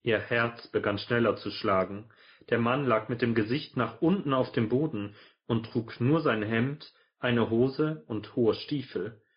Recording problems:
high frequencies cut off; noticeable; nothing above 5 kHz
garbled, watery; slightly

